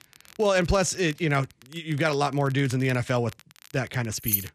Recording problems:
crackle, like an old record; faint; 25 dB below the speech
jangling keys; very faint; at 4.5 s; peak level with the speech

